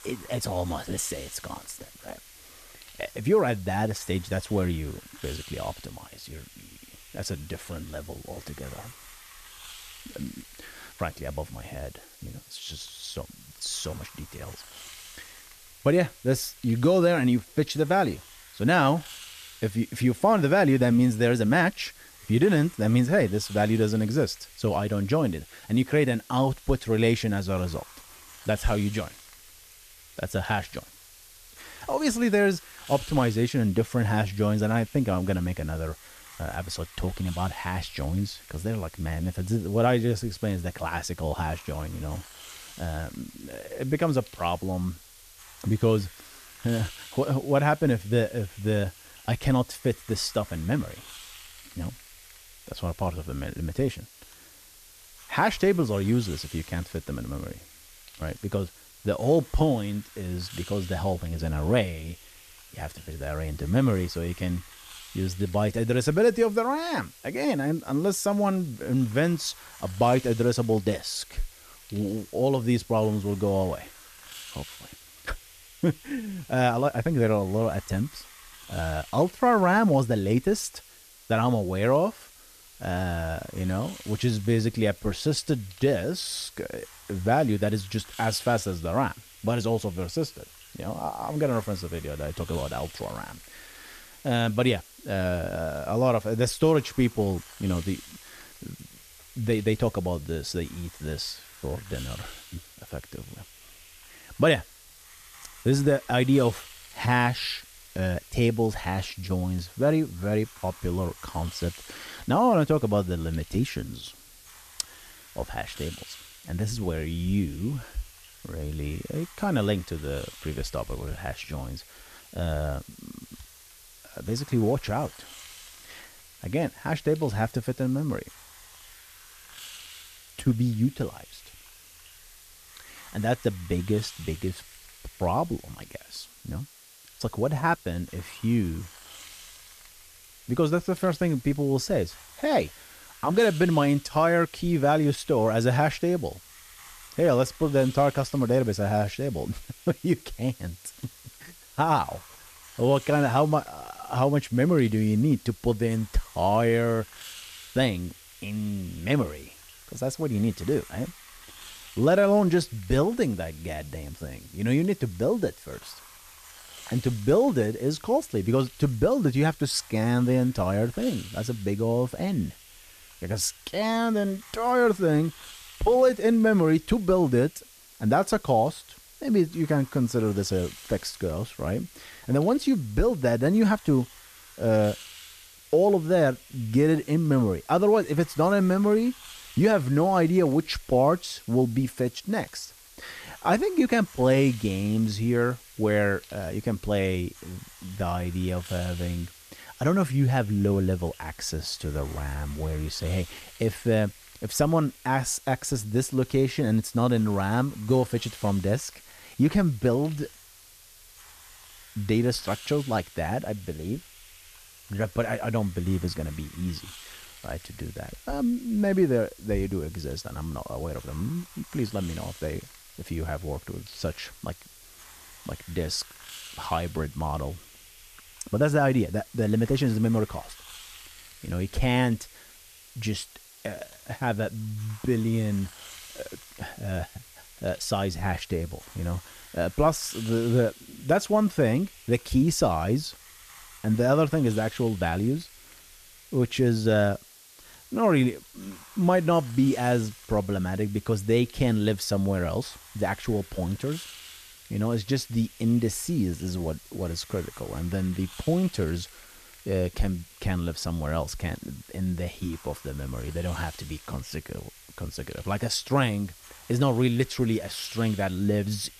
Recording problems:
hiss; noticeable; throughout; 20 dB below the speech

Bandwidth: 14.5 kHz